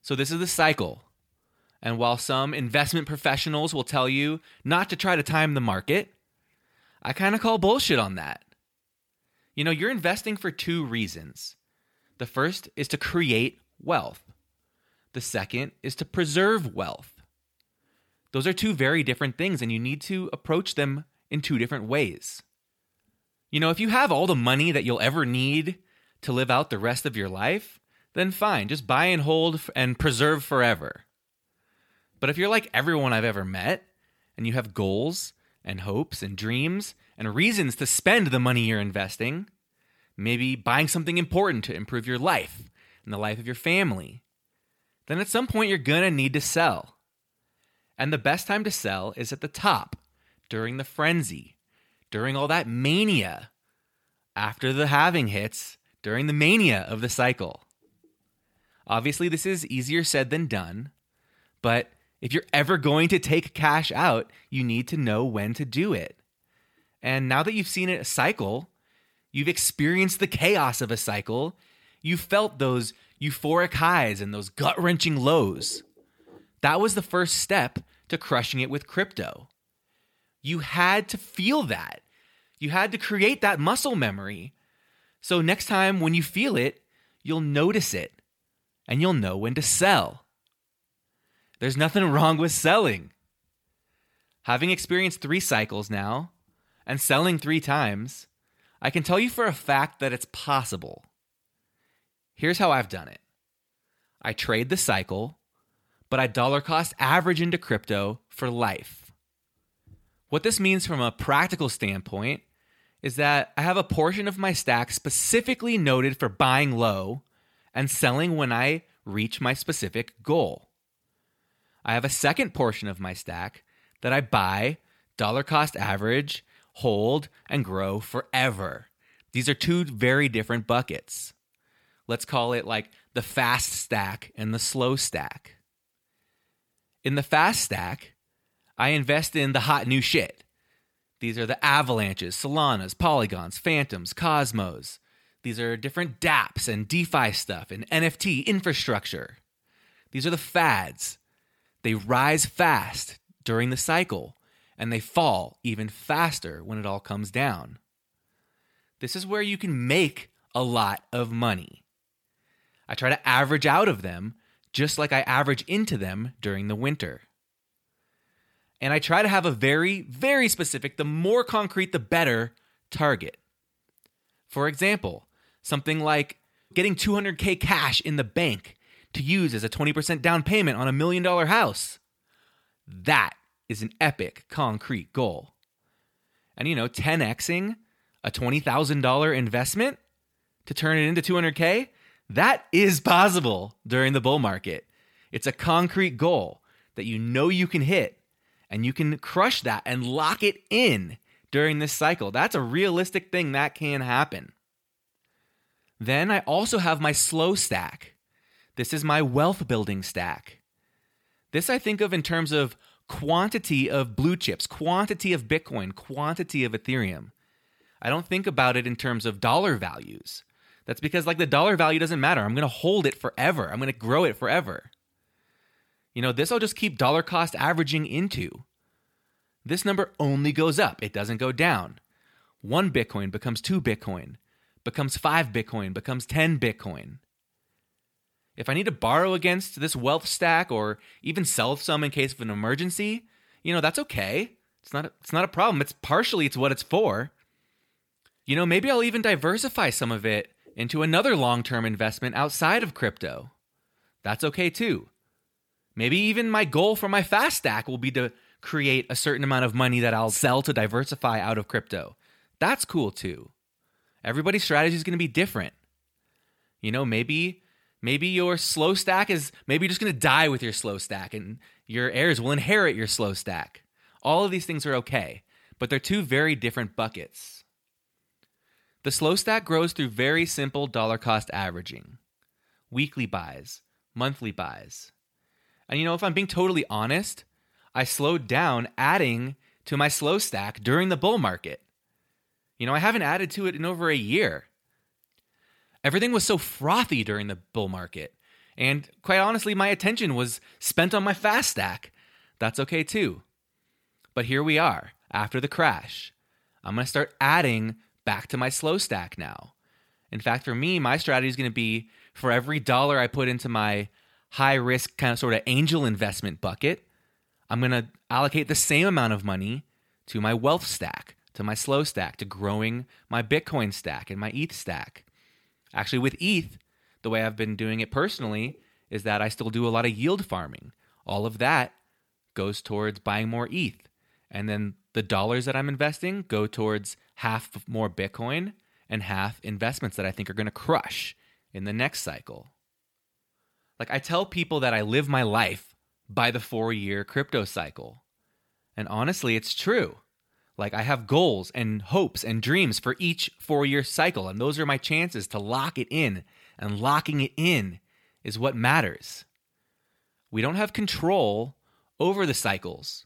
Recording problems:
none

